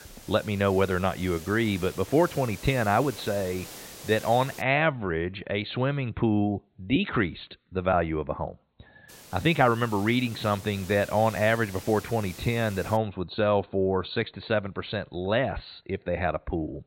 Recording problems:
high frequencies cut off; severe; nothing above 4.5 kHz
hiss; noticeable; until 4.5 s and from 9 to 13 s; 15 dB below the speech

